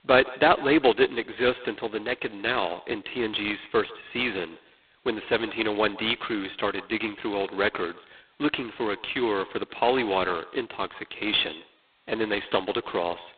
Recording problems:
phone-call audio; poor line; nothing above 3.5 kHz
echo of what is said; faint; throughout; 150 ms later, 20 dB below the speech

